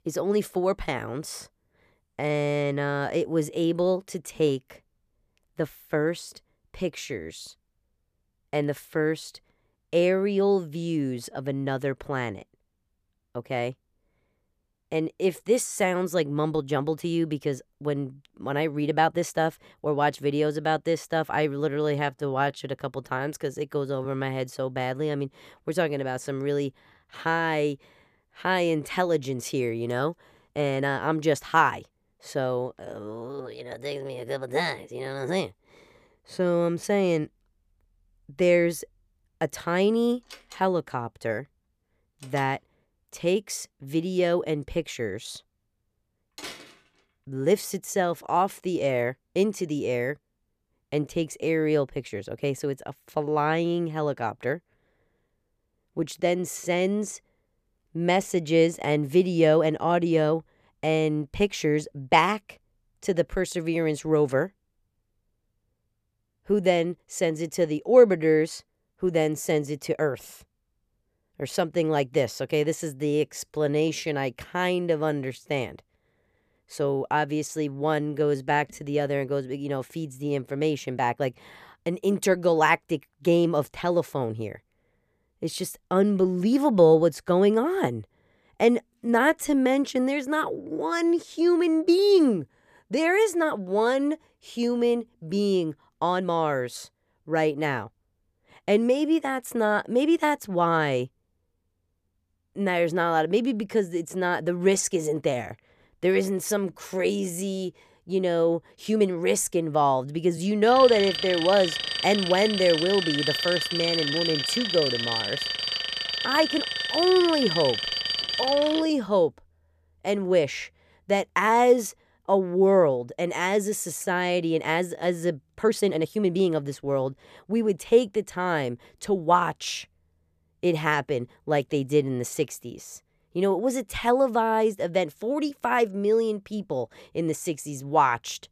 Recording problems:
uneven, jittery; strongly; from 16 s to 2:07
door banging; faint; from 40 to 47 s; peak 15 dB below the speech
alarm; loud; from 1:51 to 1:59; peak 1 dB above the speech

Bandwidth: 14.5 kHz